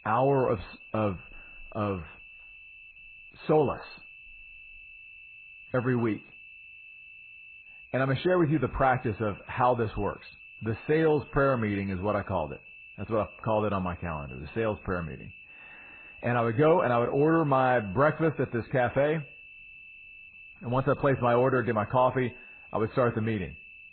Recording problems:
garbled, watery; badly; nothing above 4 kHz
muffled; very slightly; fading above 1.5 kHz
high-pitched whine; noticeable; throughout; 2.5 kHz, 20 dB below the speech

